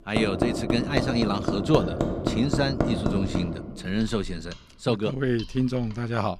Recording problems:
machinery noise; loud; throughout; 1 dB below the speech

